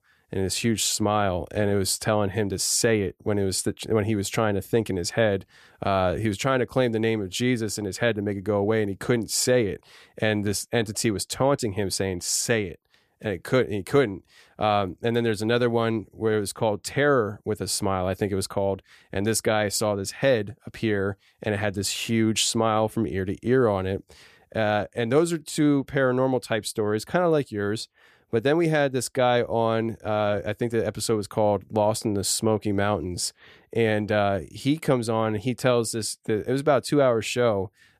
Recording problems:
none

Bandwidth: 14.5 kHz